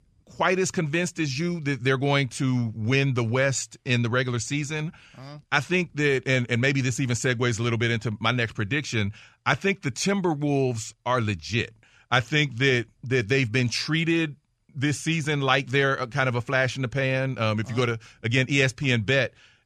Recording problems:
none

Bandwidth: 13.5 kHz